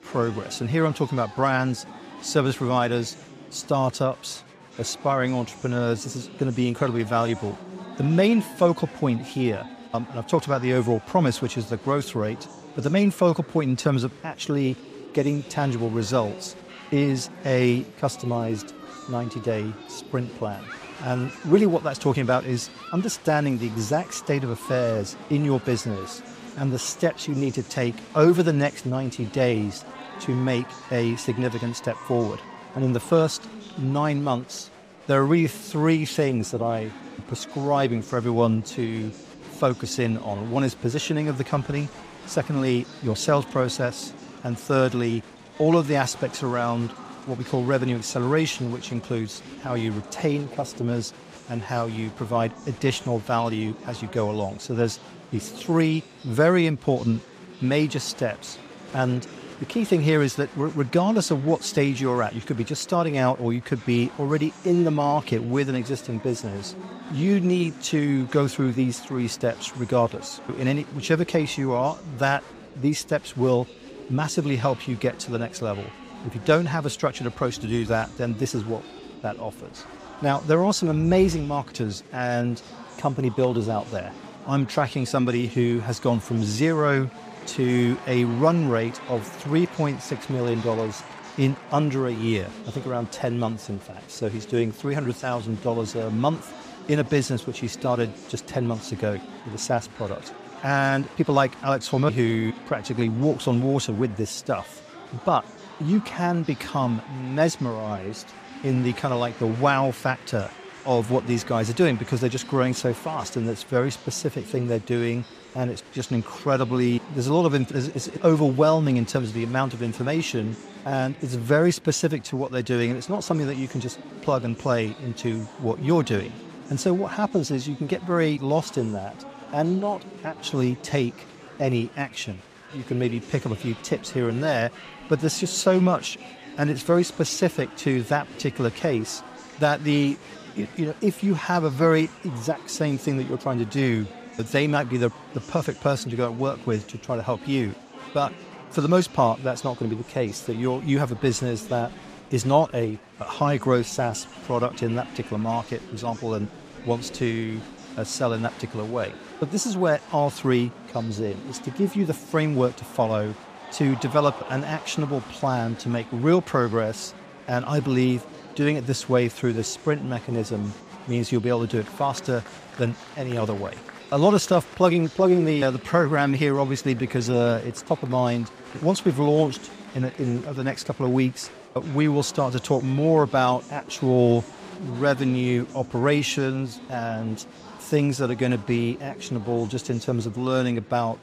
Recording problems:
murmuring crowd; noticeable; throughout; 15 dB below the speech

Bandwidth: 15 kHz